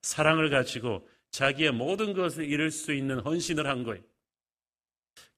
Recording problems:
none

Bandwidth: 14.5 kHz